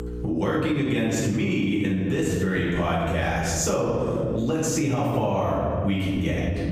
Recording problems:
off-mic speech; far
room echo; noticeable; dies away in 1.7 s
squashed, flat; somewhat
electrical hum; faint; throughout; 60 Hz, 25 dB below the speech

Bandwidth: 15 kHz